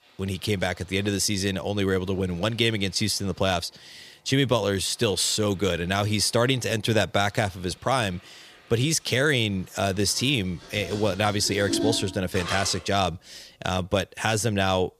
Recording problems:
household noises; loud; throughout; 10 dB below the speech

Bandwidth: 15 kHz